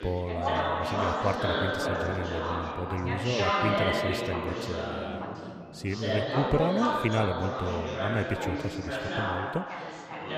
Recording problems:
chatter from many people; very loud; throughout; 2 dB above the speech

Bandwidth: 15 kHz